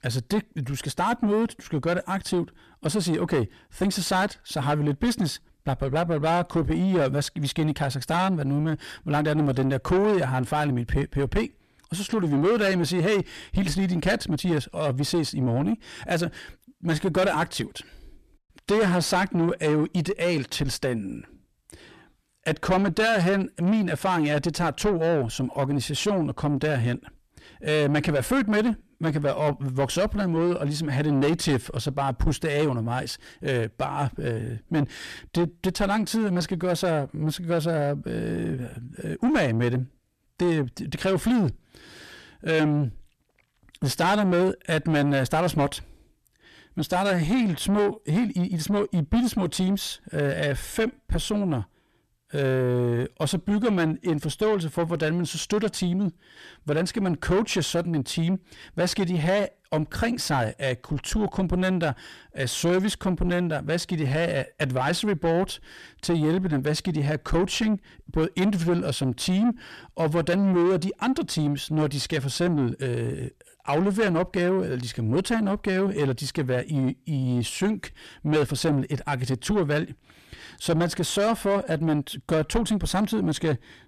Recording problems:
distortion; heavy; 7 dB below the speech

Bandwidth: 14 kHz